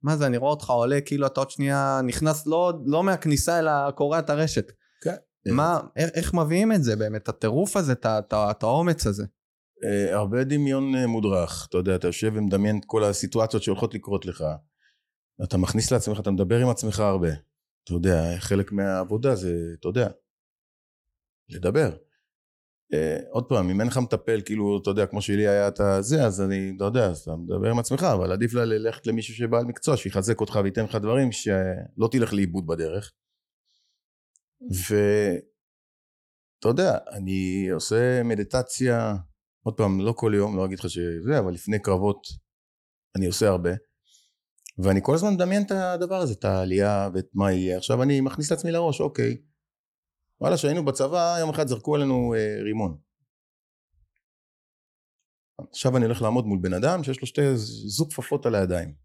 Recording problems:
none

